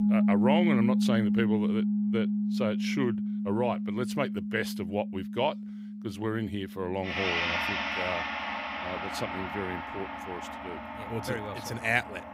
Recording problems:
background music; very loud; throughout; 3 dB above the speech

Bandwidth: 15.5 kHz